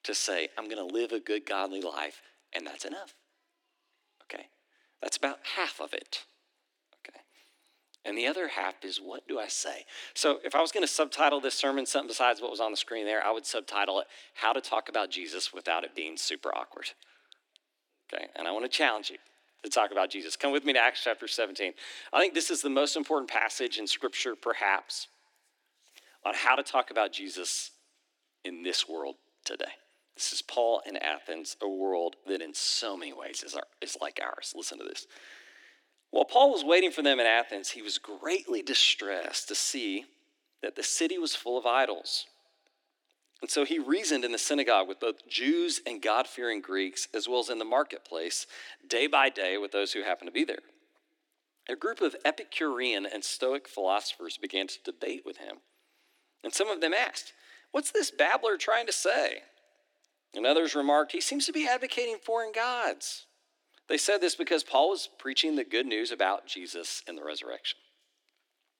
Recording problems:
thin; very slightly; fading below 300 Hz

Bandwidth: 17 kHz